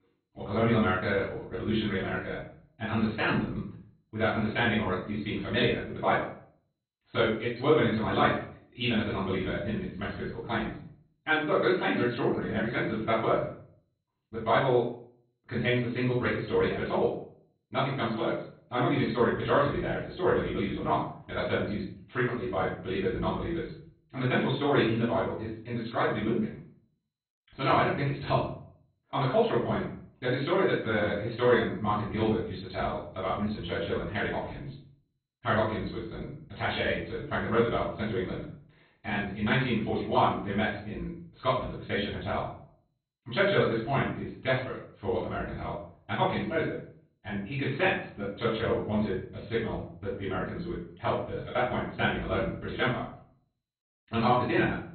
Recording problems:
off-mic speech; far
garbled, watery; badly; nothing above 4 kHz
wrong speed, natural pitch; too fast; 1.7 times normal speed
room echo; noticeable; dies away in 0.5 s

